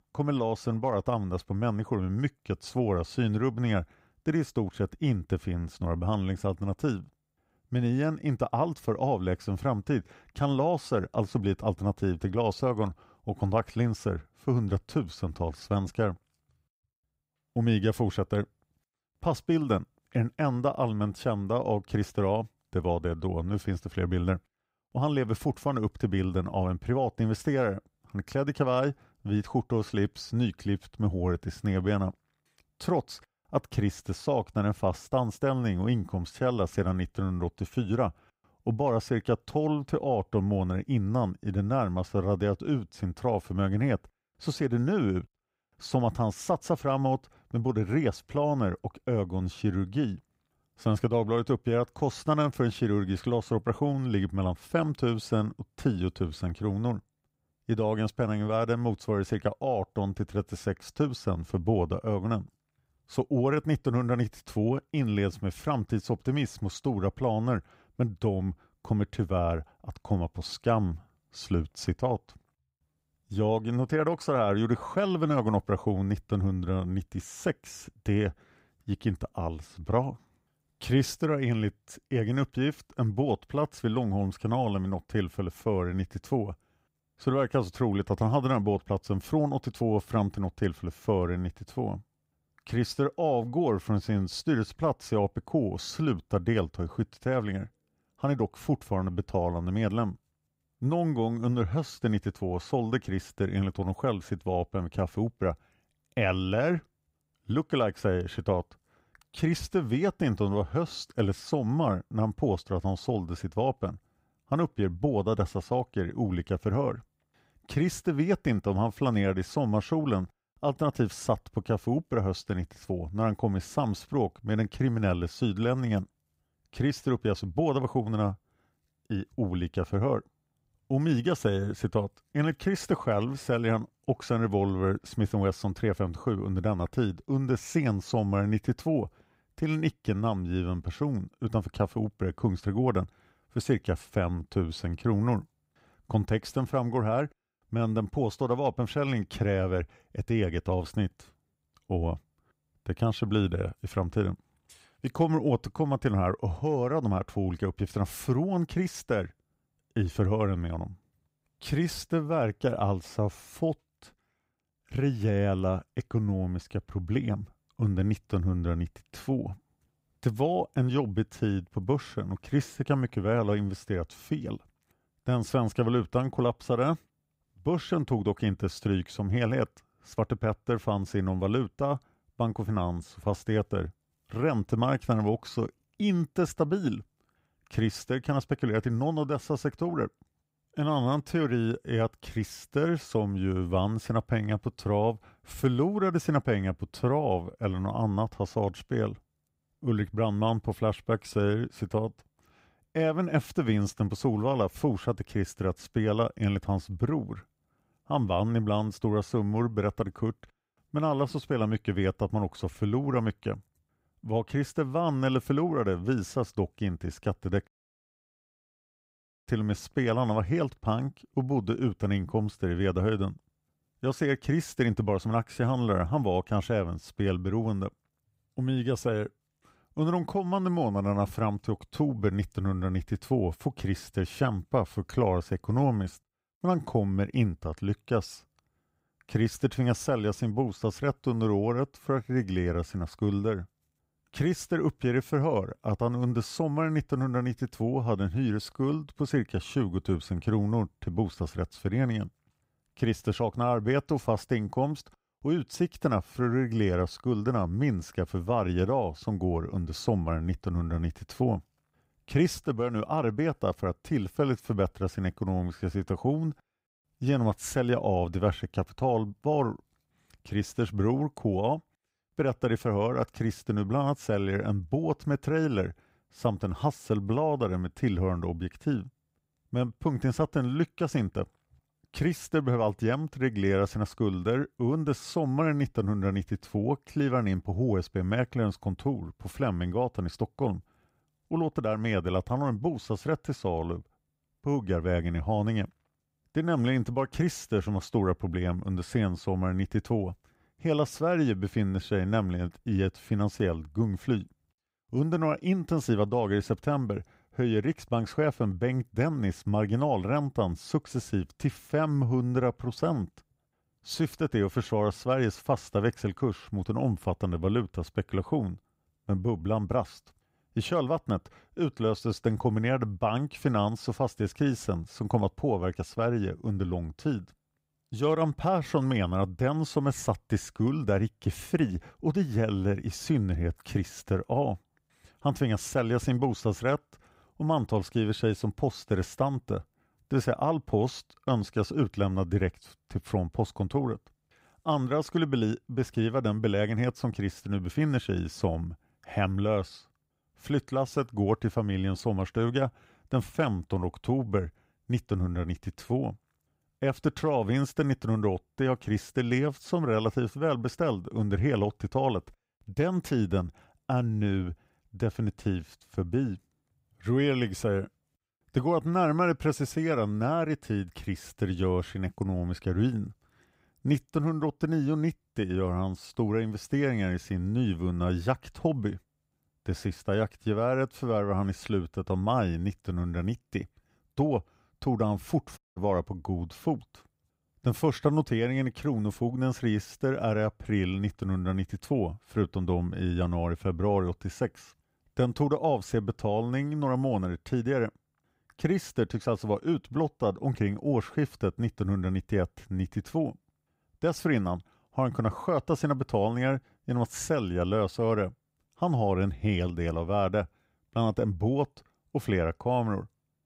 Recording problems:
audio cutting out; at 3:38 for 2 s and at 6:26

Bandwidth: 15.5 kHz